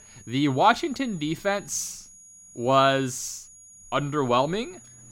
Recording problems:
high-pitched whine; faint; throughout; 6.5 kHz, 20 dB below the speech

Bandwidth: 16 kHz